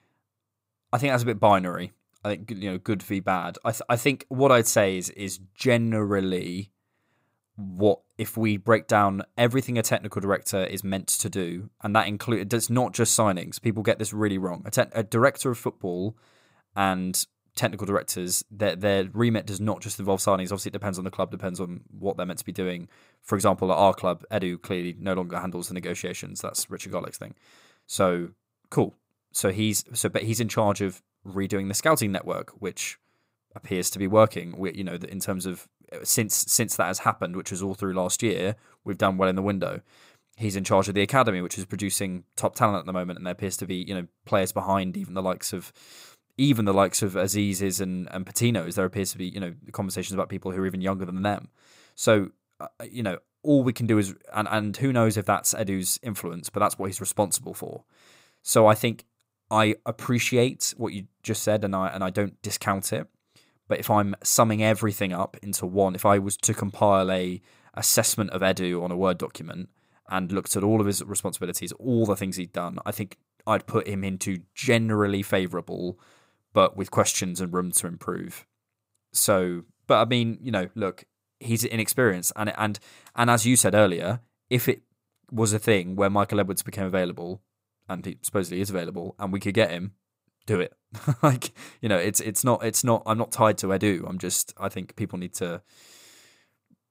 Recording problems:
none

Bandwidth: 15.5 kHz